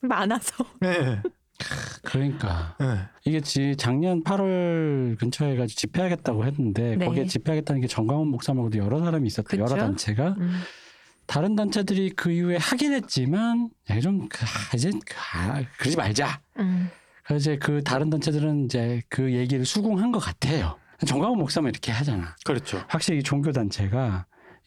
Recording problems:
squashed, flat; heavily

